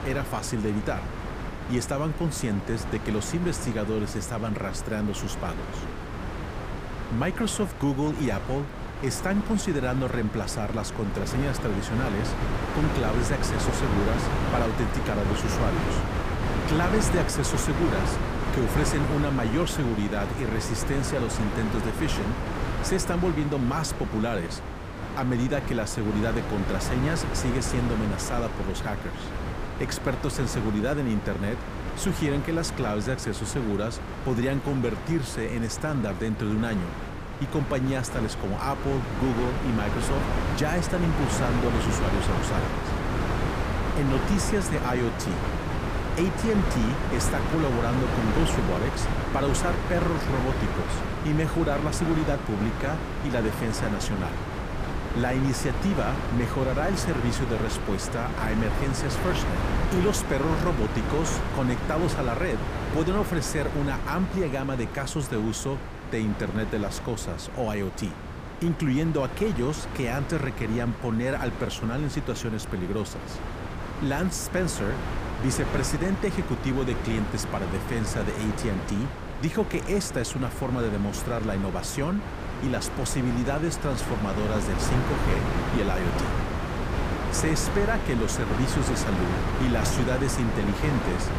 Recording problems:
wind noise on the microphone; heavy; 2 dB below the speech

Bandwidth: 15 kHz